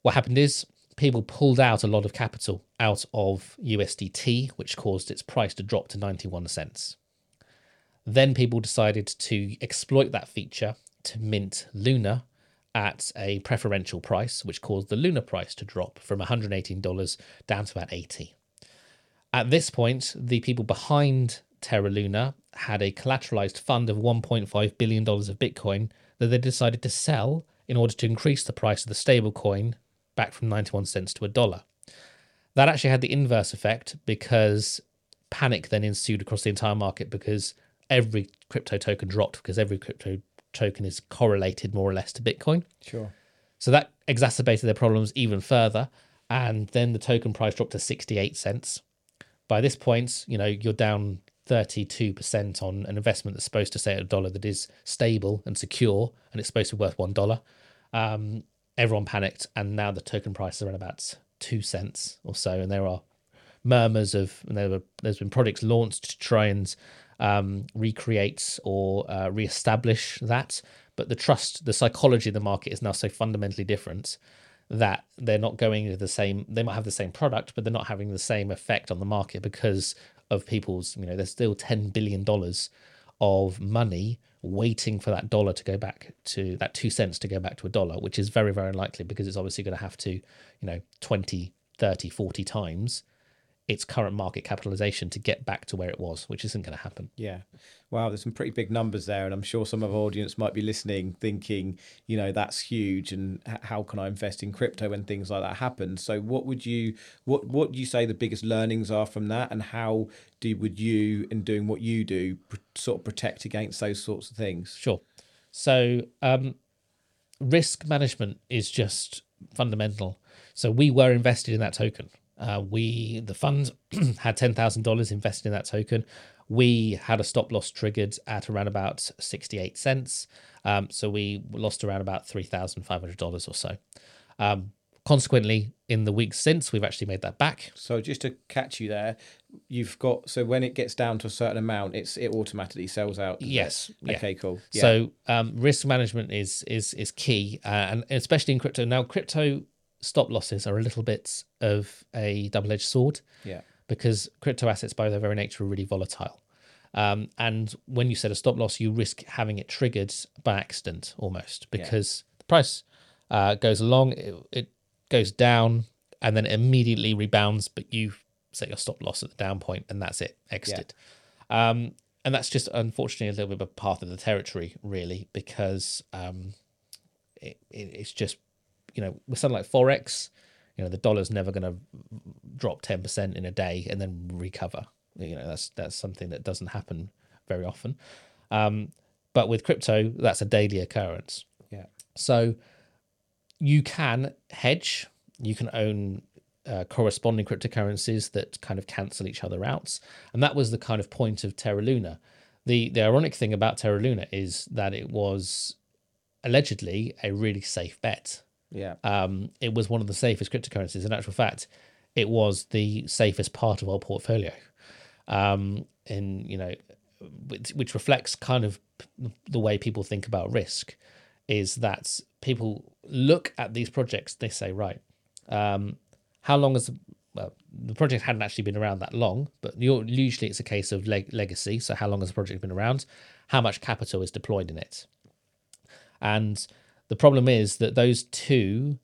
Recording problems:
none

